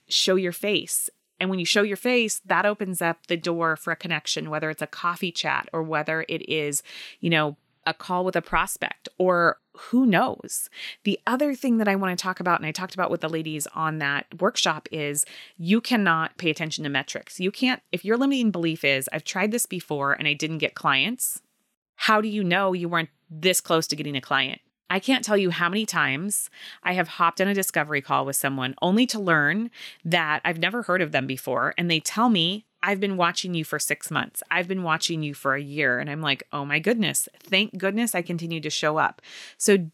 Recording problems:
none

